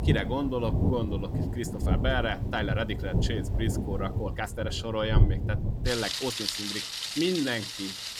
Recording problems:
rain or running water; very loud; throughout; 2 dB above the speech
uneven, jittery; strongly; from 1 to 7.5 s

